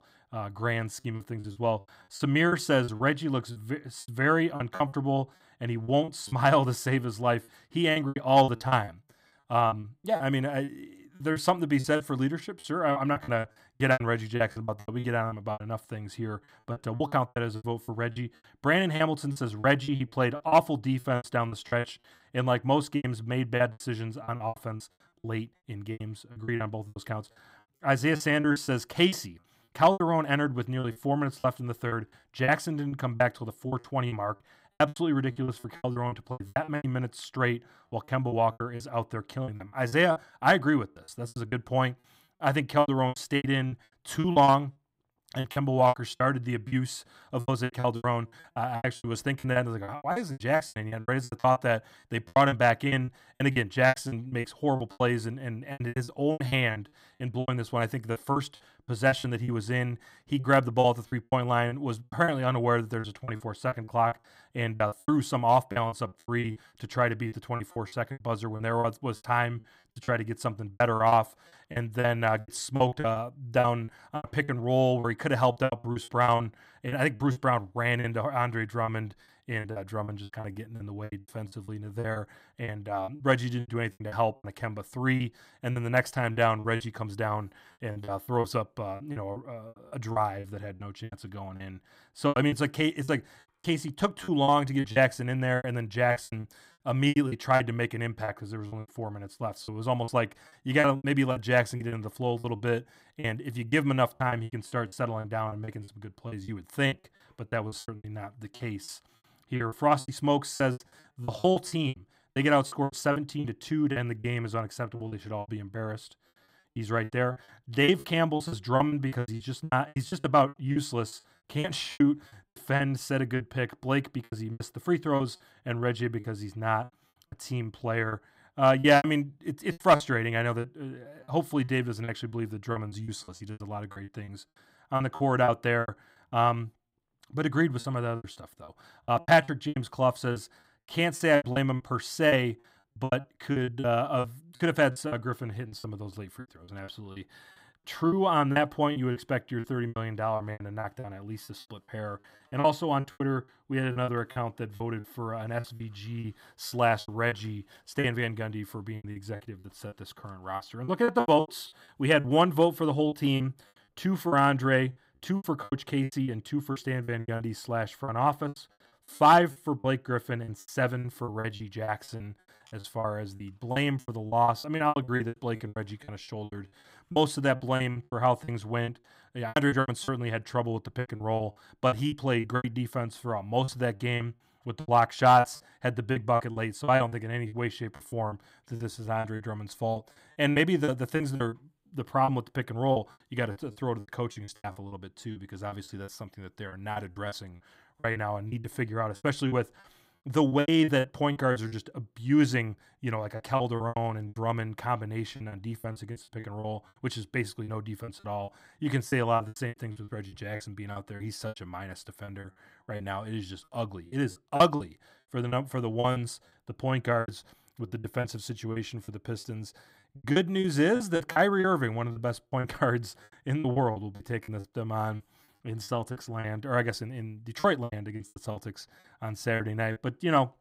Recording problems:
choppy; very; 16% of the speech affected

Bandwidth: 15.5 kHz